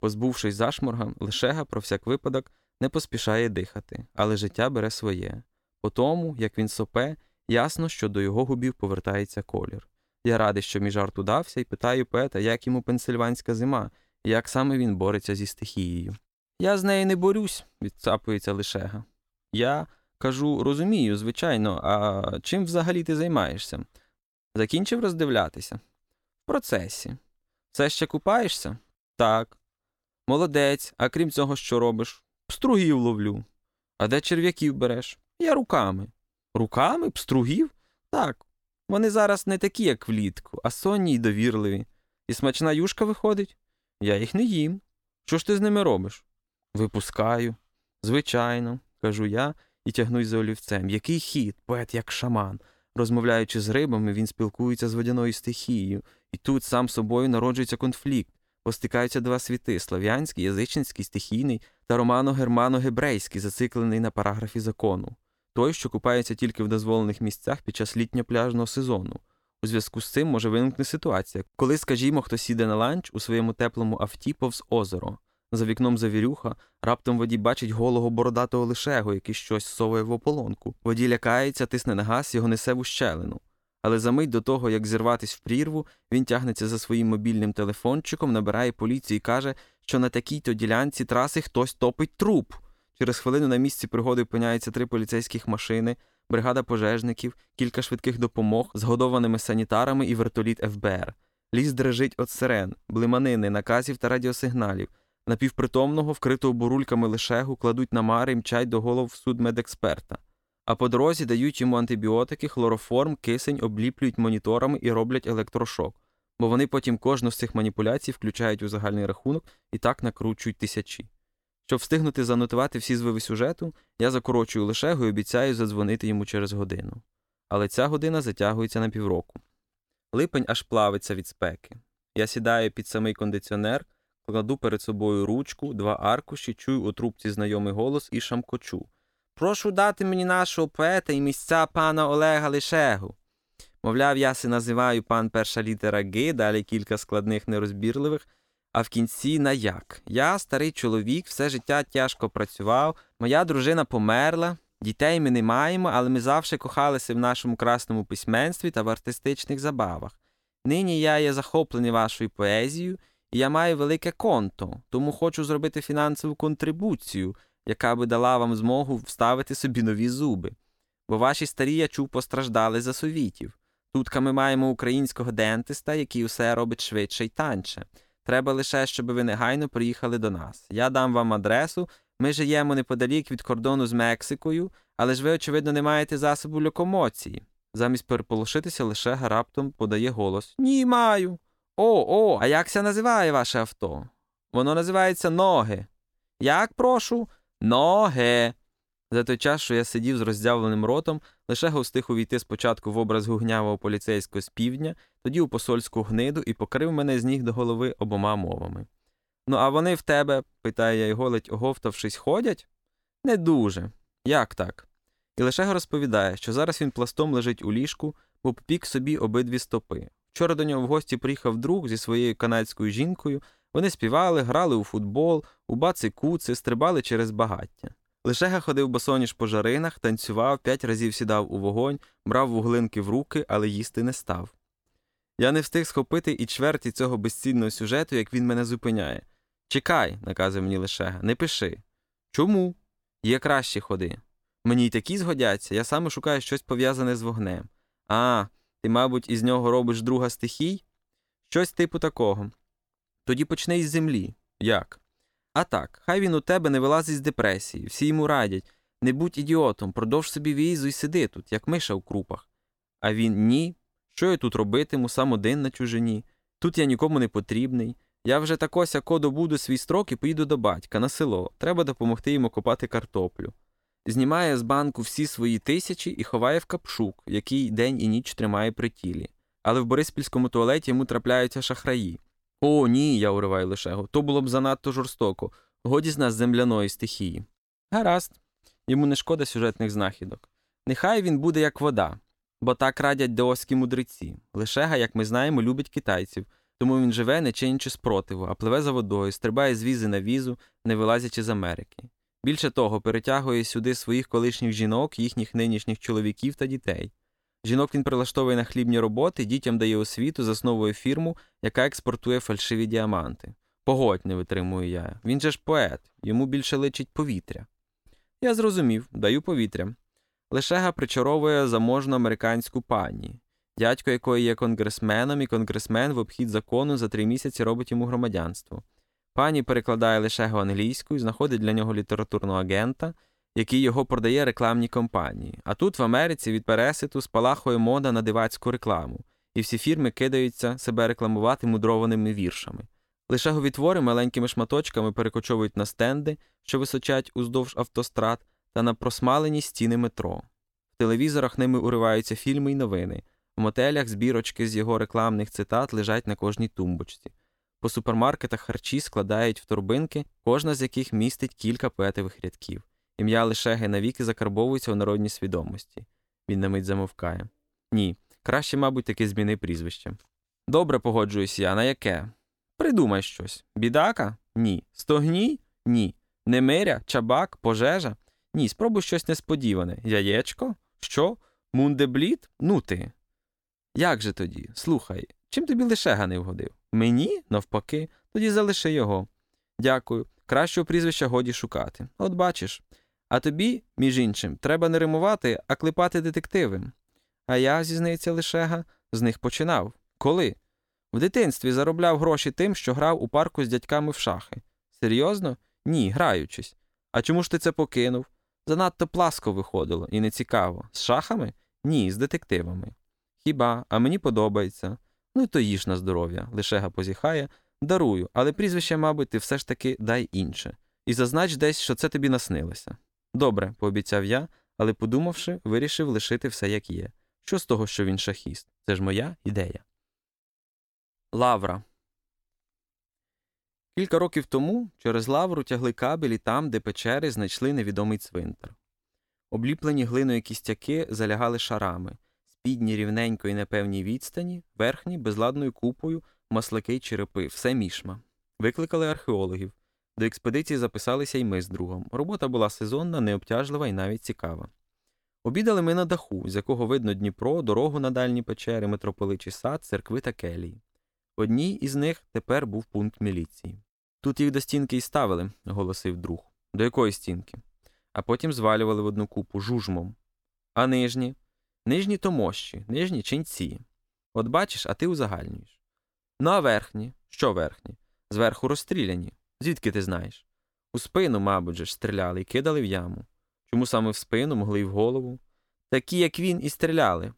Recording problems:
none

